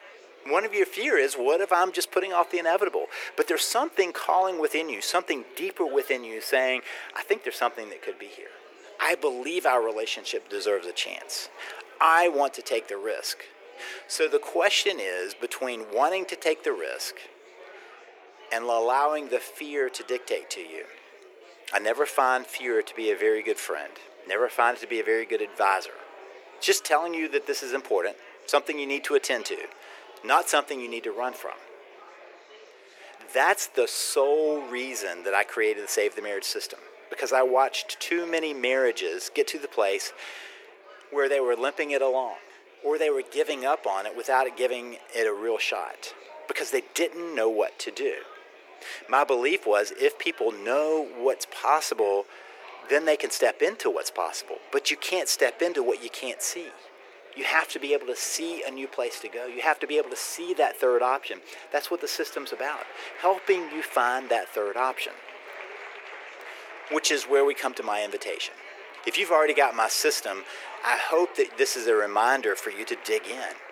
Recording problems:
thin; very; fading below 350 Hz
murmuring crowd; noticeable; throughout; 20 dB below the speech

